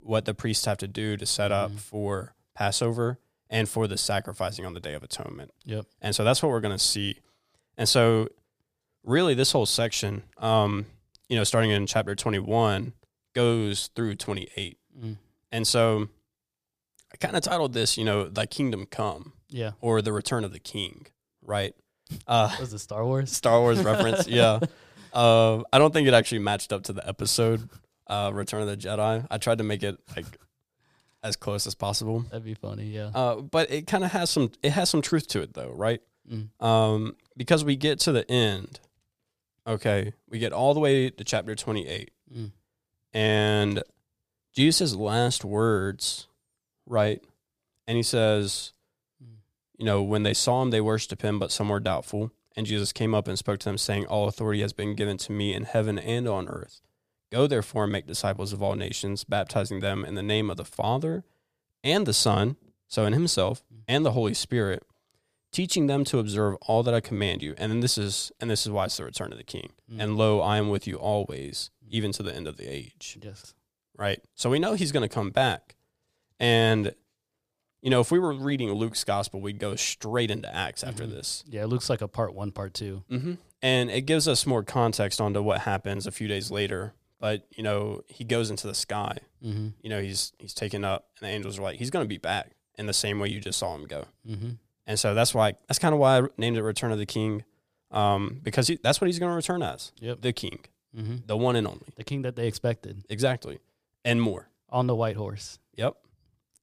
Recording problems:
none

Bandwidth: 15 kHz